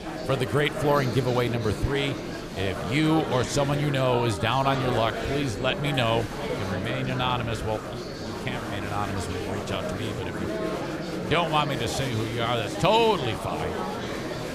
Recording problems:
chatter from many people; loud; throughout; 5 dB below the speech

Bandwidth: 14.5 kHz